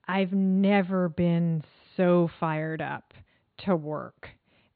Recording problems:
high frequencies cut off; severe; nothing above 4.5 kHz

